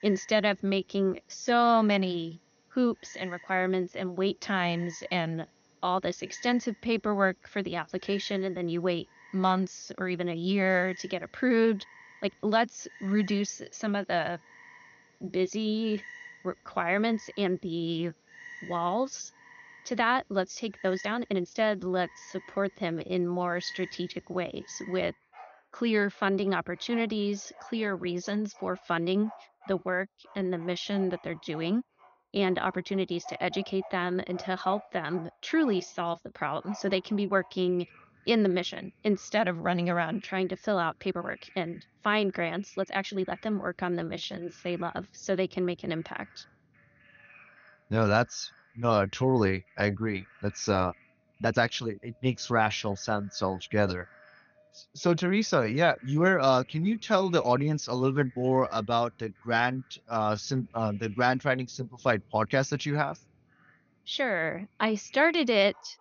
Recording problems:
high frequencies cut off; noticeable; nothing above 6.5 kHz
animal sounds; faint; throughout; 20 dB below the speech
uneven, jittery; strongly; from 0.5 s to 1:03

